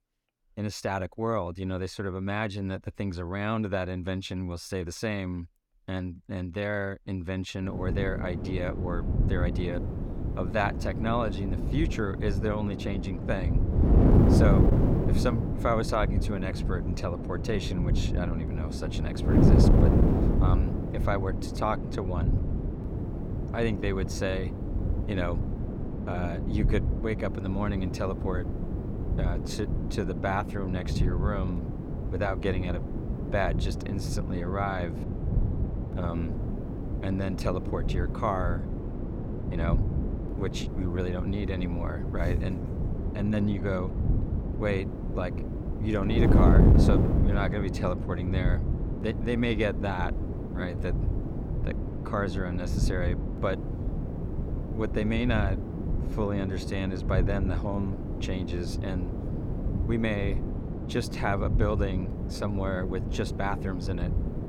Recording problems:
wind noise on the microphone; heavy; from 7.5 s on; 4 dB below the speech

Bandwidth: 17.5 kHz